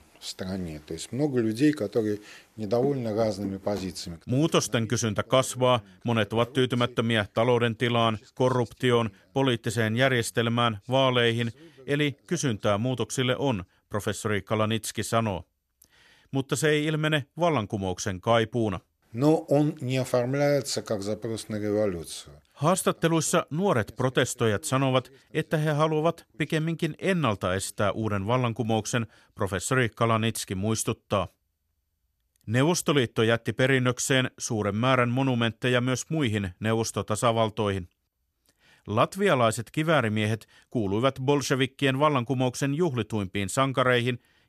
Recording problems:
none

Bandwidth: 13.5 kHz